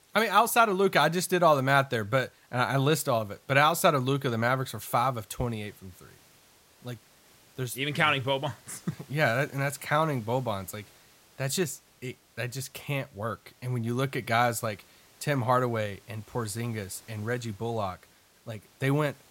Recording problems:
hiss; faint; throughout; 30 dB below the speech

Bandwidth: 16 kHz